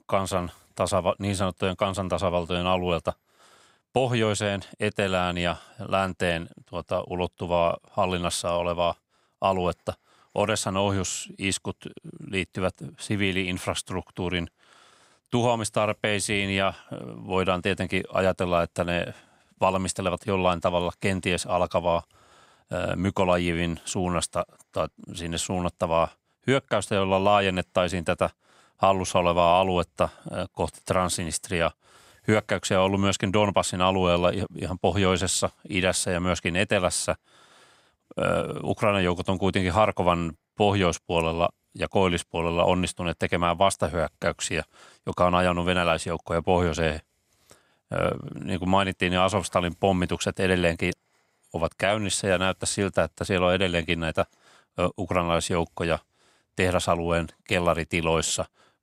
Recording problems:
none

